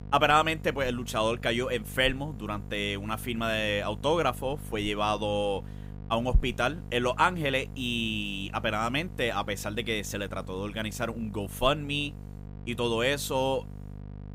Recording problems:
electrical hum; faint; throughout; 50 Hz, 25 dB below the speech

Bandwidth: 15.5 kHz